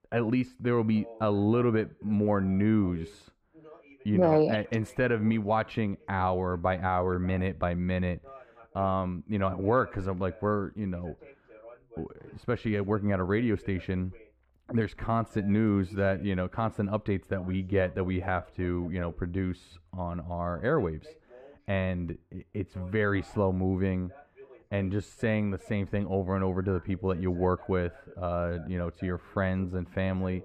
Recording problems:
muffled; very; fading above 3 kHz
voice in the background; faint; throughout; 25 dB below the speech

